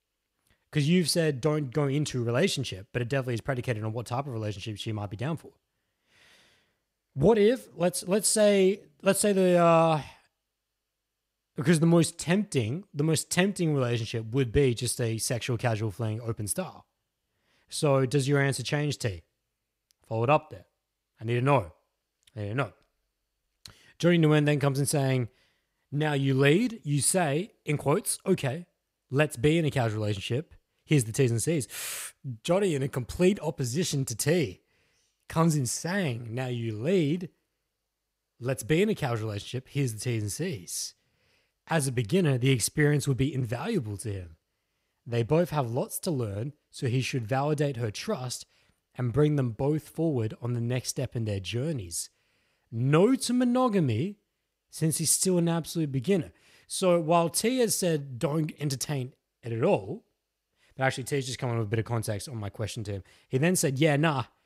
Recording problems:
none

